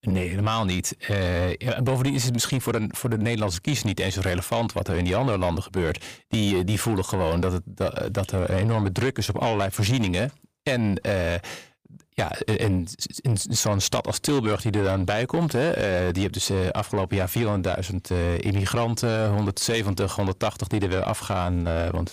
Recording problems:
distortion; slight; 10 dB below the speech

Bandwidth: 15 kHz